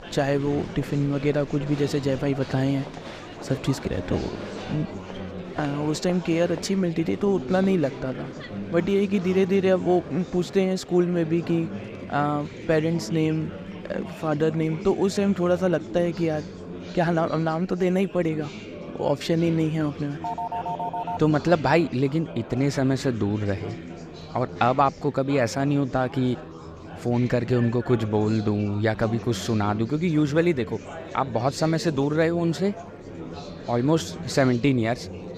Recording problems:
murmuring crowd; noticeable; throughout; 15 dB below the speech
phone ringing; noticeable; at 20 s; peak 5 dB below the speech

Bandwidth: 15 kHz